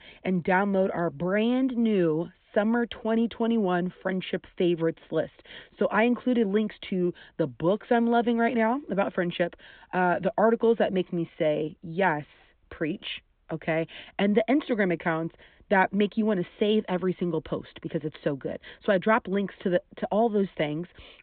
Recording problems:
high frequencies cut off; severe; nothing above 4 kHz

